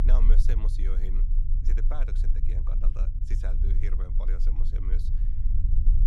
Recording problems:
low rumble; loud; throughout; 4 dB below the speech

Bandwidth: 14 kHz